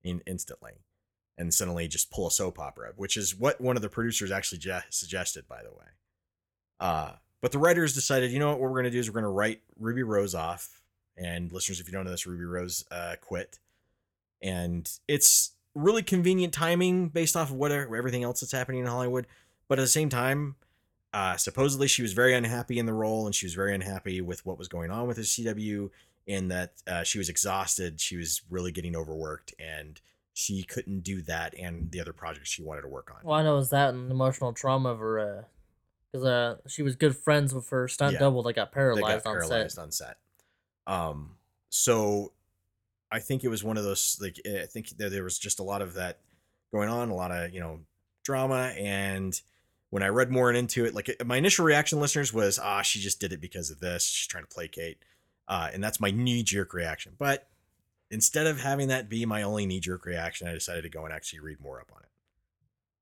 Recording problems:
none

